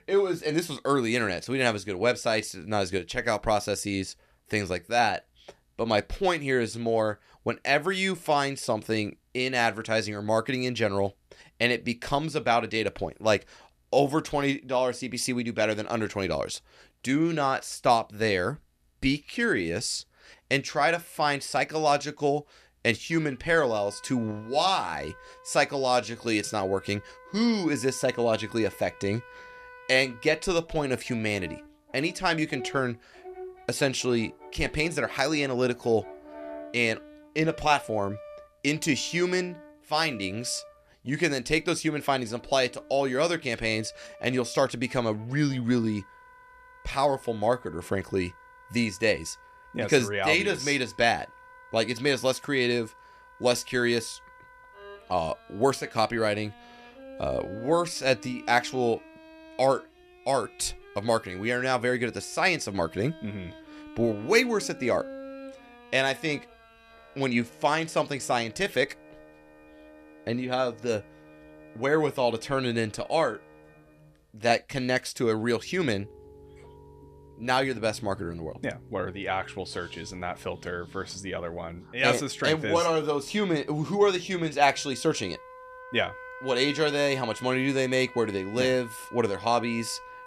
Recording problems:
background music; faint; from 22 s on; 20 dB below the speech

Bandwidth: 14.5 kHz